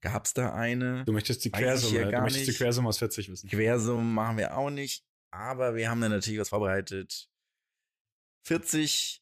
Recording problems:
uneven, jittery; strongly; from 1 to 8.5 s

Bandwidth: 14.5 kHz